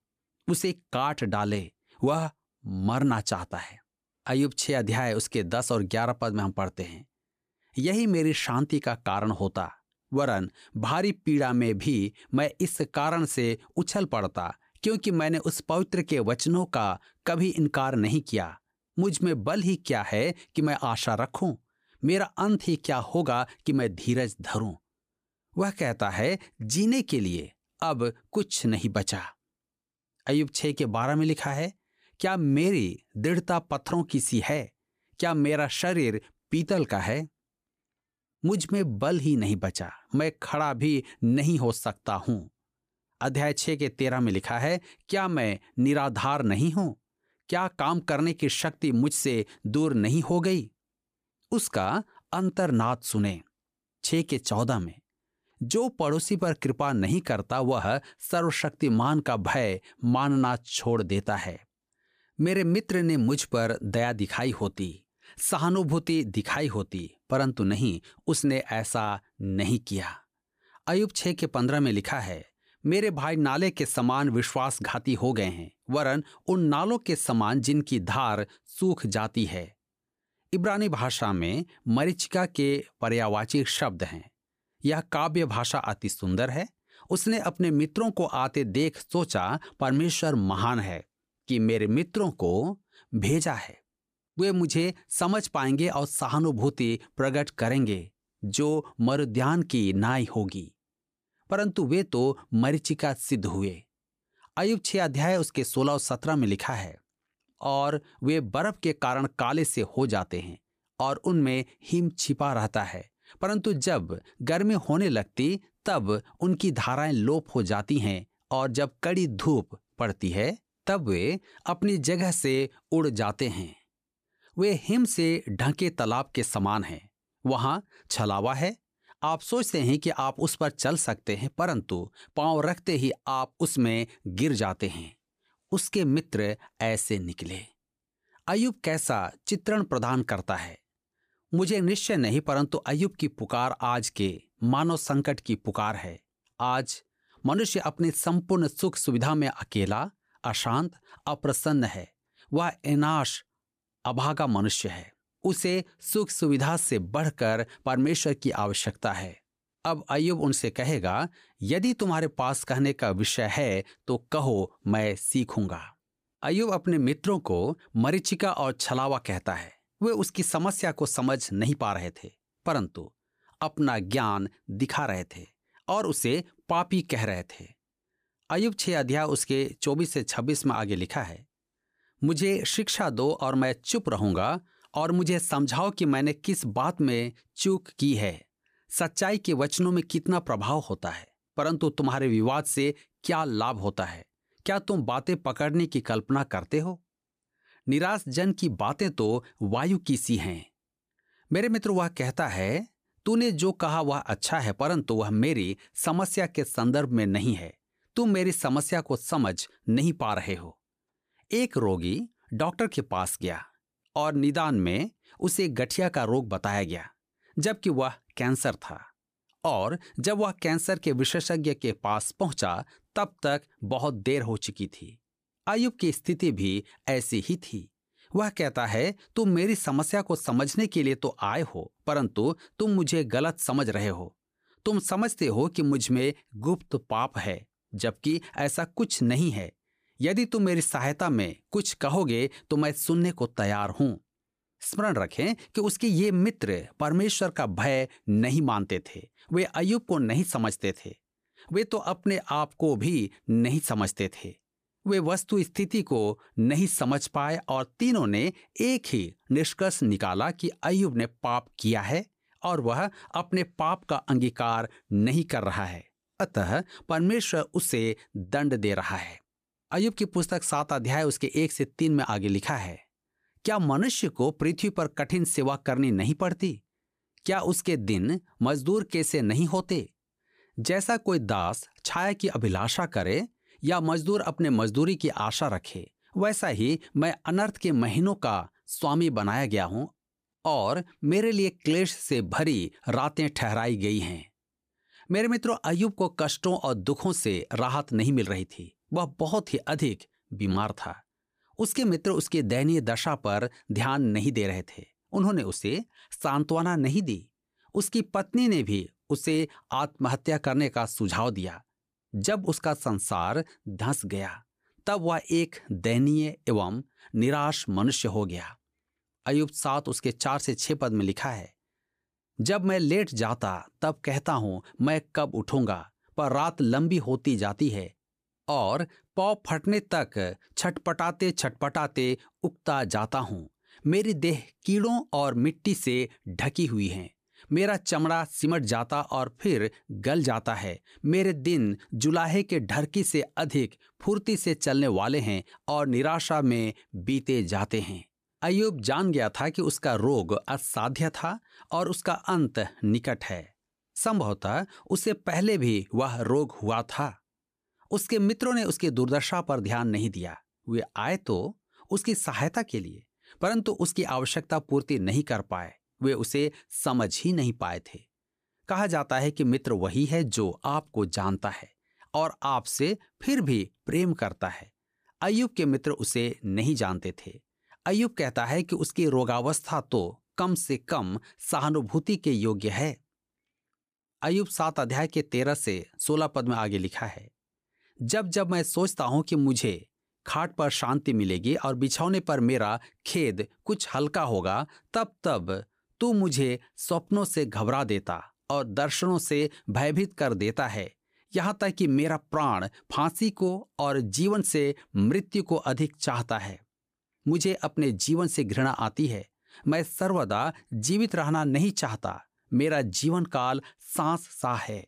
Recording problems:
none

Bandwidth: 15 kHz